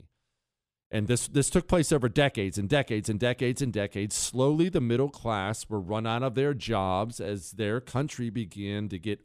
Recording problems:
none

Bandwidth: 14.5 kHz